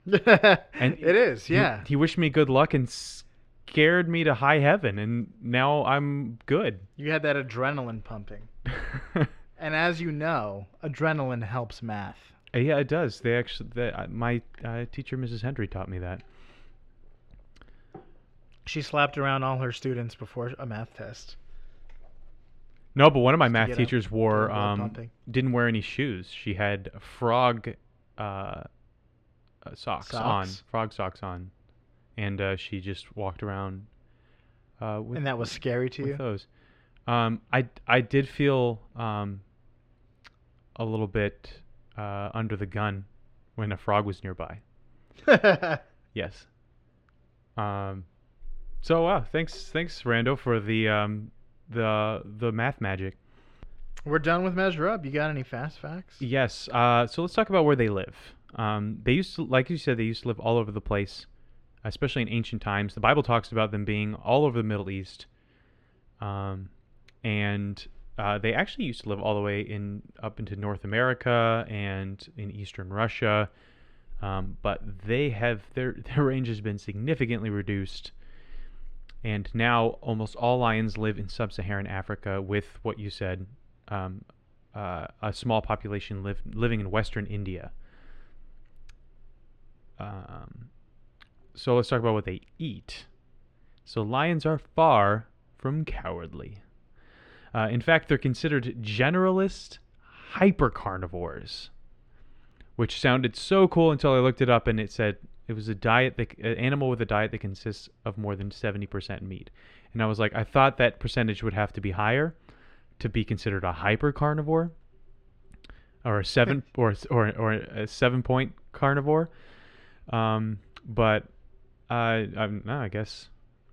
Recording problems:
muffled; slightly; fading above 3 kHz

